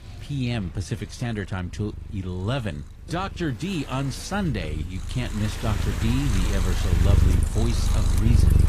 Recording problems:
garbled, watery; slightly
animal sounds; very loud; throughout; 3 dB above the speech
rain or running water; loud; from 5.5 s on; 9 dB below the speech
wind noise on the microphone; occasional gusts; 15 dB below the speech
traffic noise; faint; throughout; 25 dB below the speech

